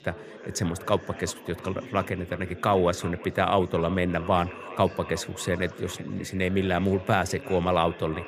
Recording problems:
echo of what is said; faint; throughout; 360 ms later, 20 dB below the speech
chatter from many people; noticeable; throughout; 15 dB below the speech

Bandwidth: 15 kHz